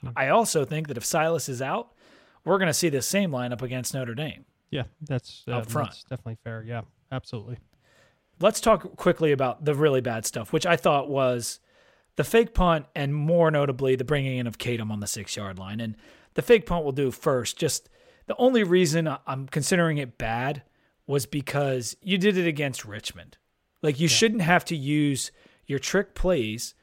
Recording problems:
none

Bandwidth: 16 kHz